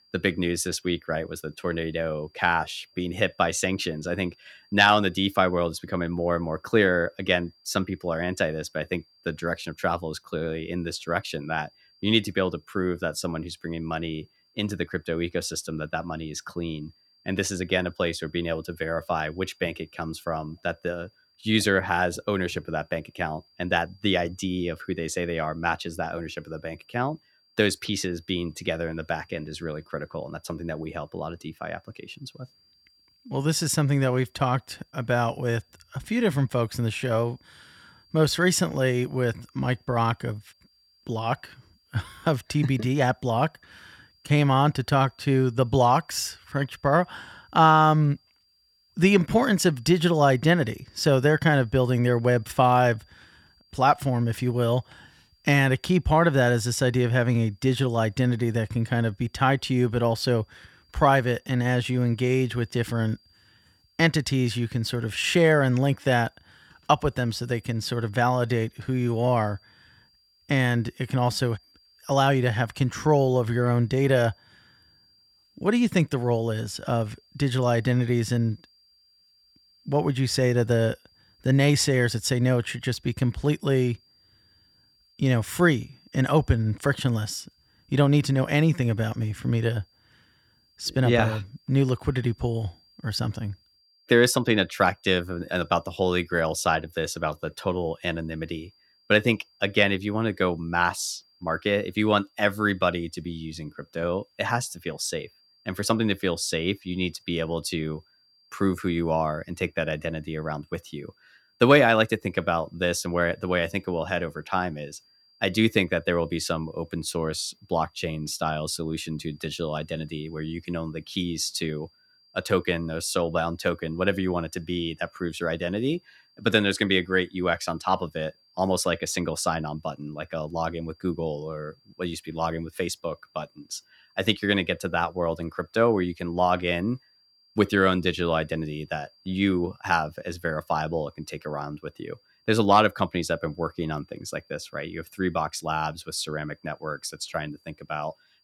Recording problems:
high-pitched whine; faint; throughout; 4.5 kHz, 35 dB below the speech

